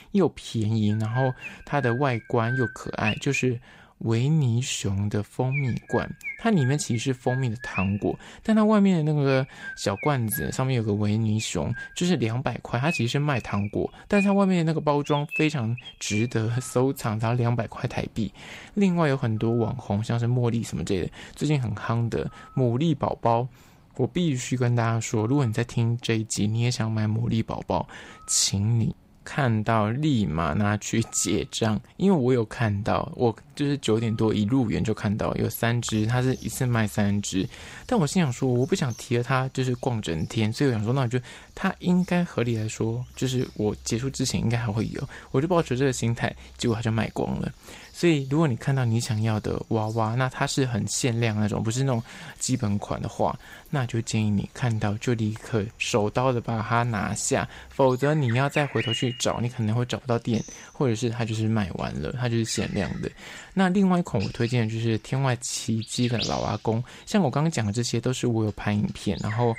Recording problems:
animal sounds; noticeable; throughout; 15 dB below the speech

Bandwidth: 15.5 kHz